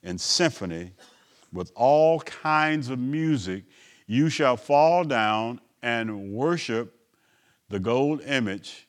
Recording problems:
none

